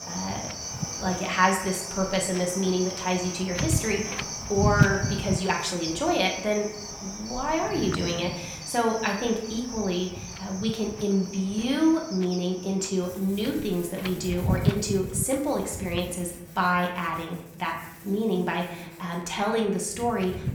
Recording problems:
room echo; slight; dies away in 0.7 s
off-mic speech; somewhat distant
animal sounds; loud; throughout; 9 dB below the speech
wind noise on the microphone; occasional gusts; 10 dB below the speech

